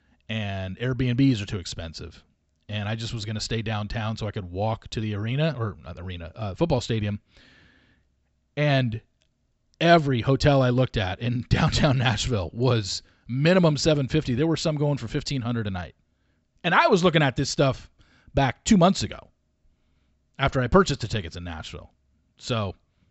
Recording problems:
high frequencies cut off; noticeable; nothing above 7.5 kHz

